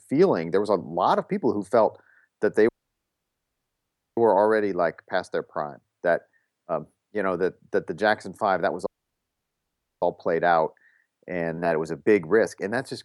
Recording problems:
audio cutting out; at 2.5 s for 1.5 s and at 9 s for 1 s

